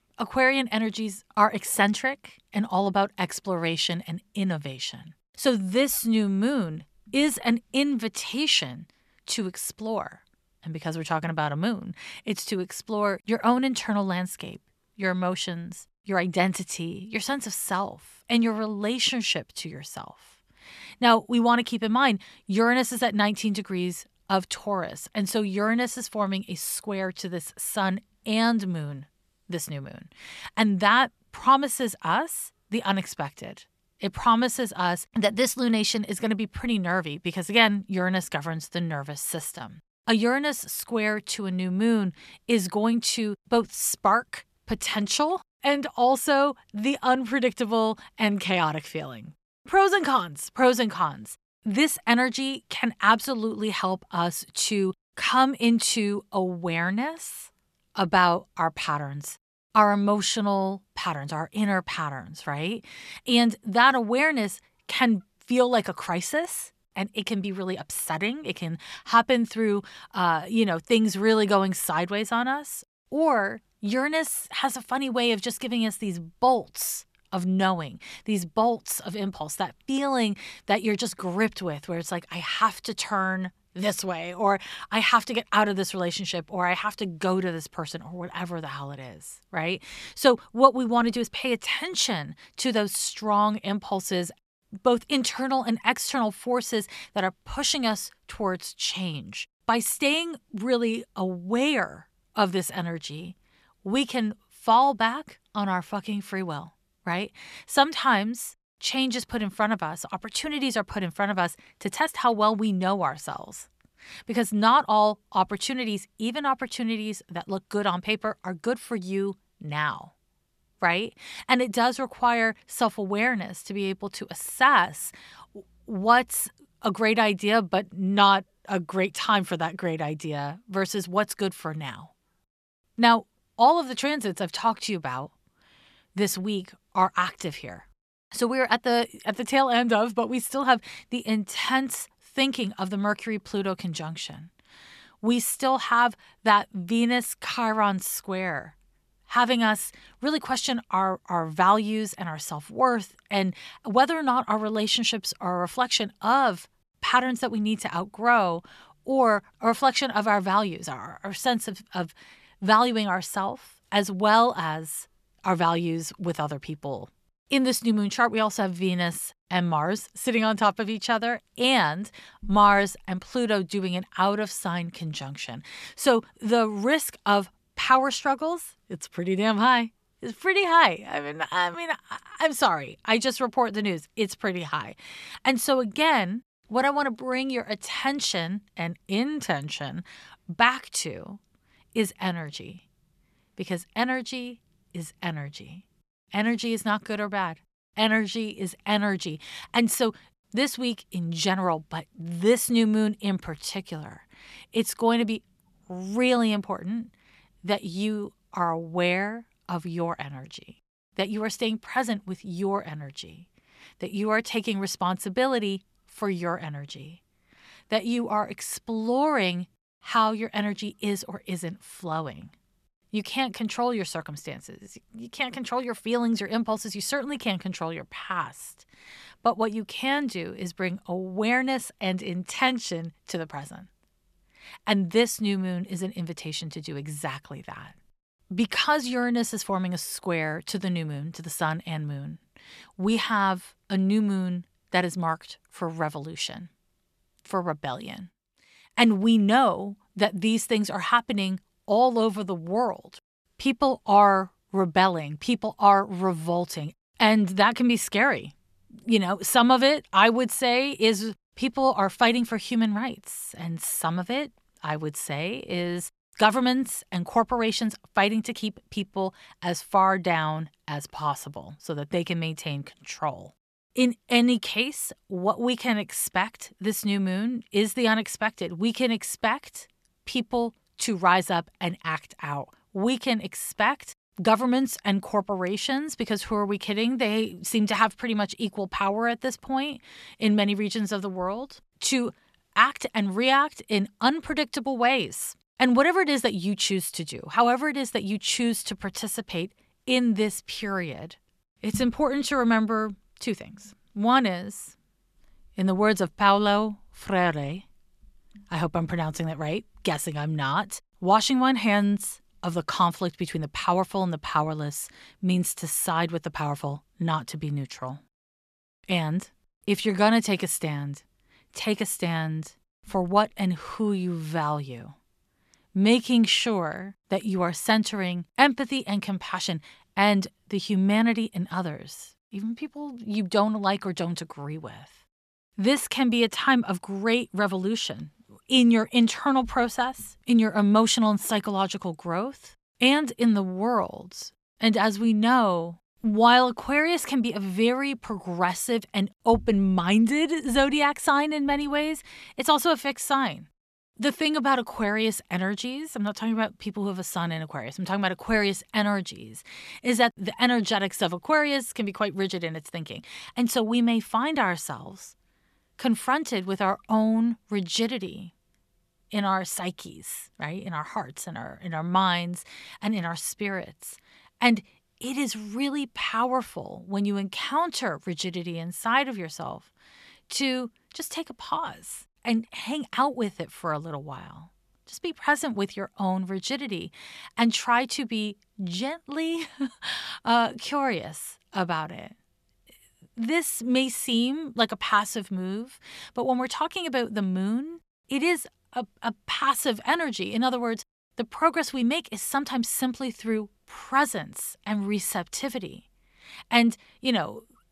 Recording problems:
none

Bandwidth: 14 kHz